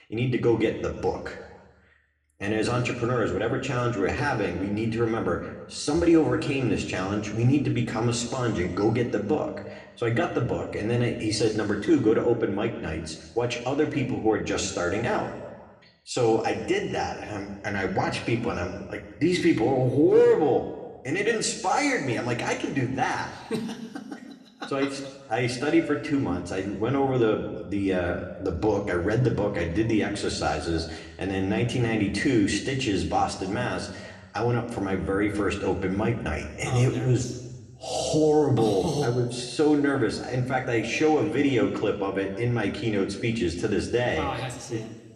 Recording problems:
room echo; slight; dies away in 1.1 s
off-mic speech; somewhat distant

